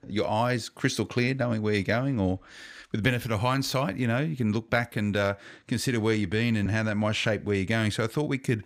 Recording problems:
none

